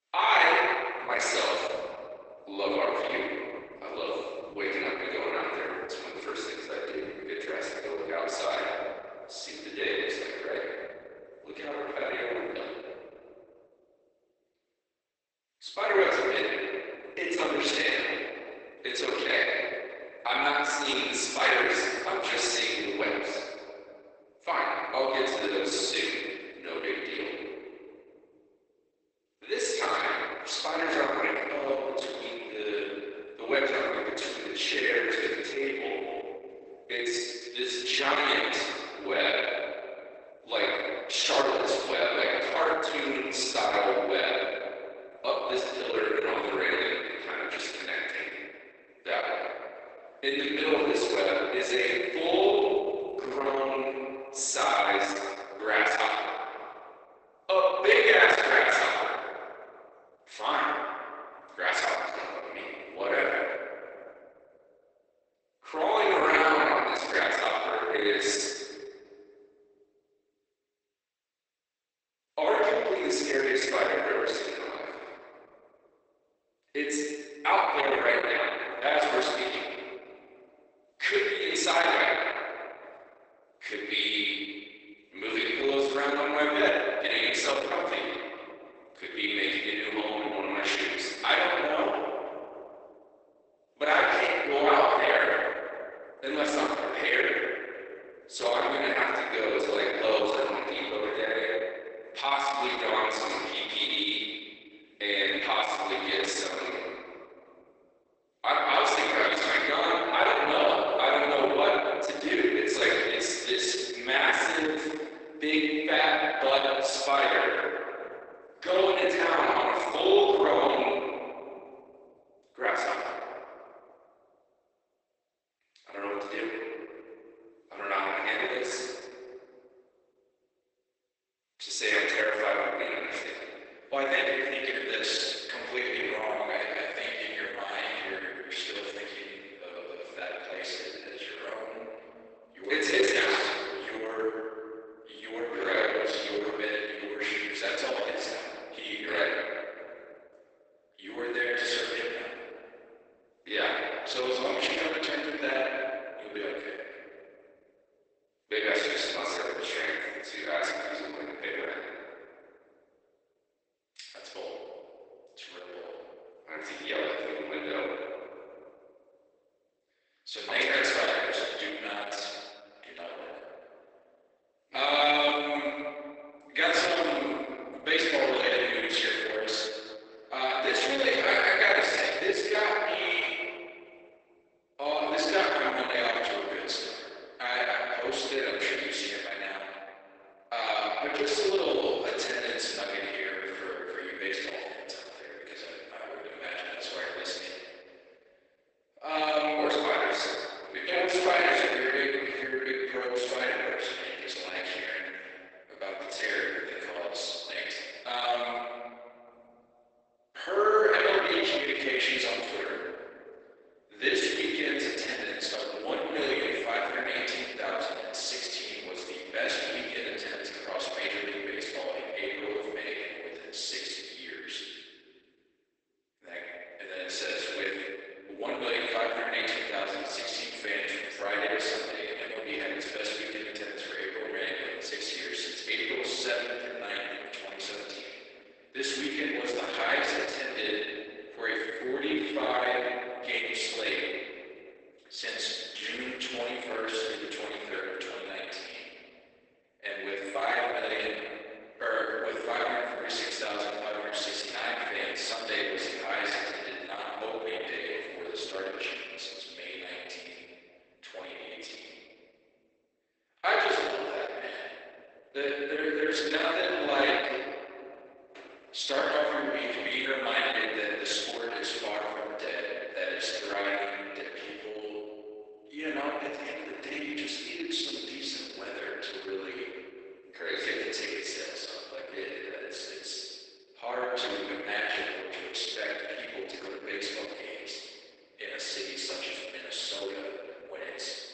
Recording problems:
room echo; strong; dies away in 1.9 s
off-mic speech; far
garbled, watery; badly; nothing above 8 kHz
thin; somewhat; fading below 300 Hz

